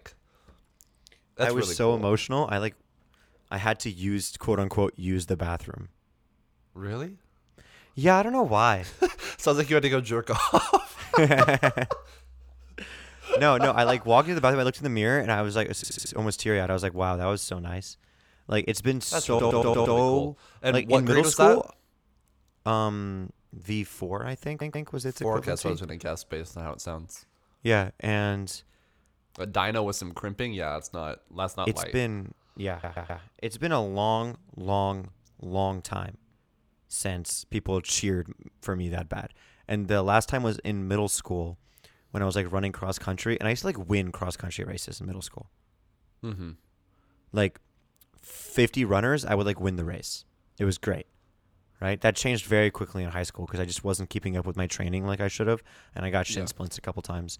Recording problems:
audio stuttering; 4 times, first at 16 s

